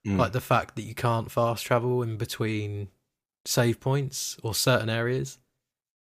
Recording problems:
none

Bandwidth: 15 kHz